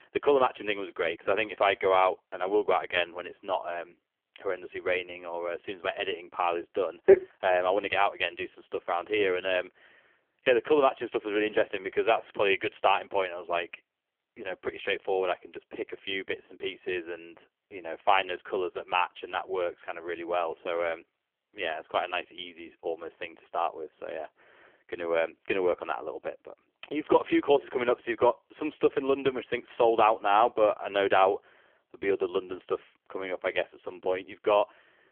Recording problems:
phone-call audio; poor line; nothing above 3.5 kHz

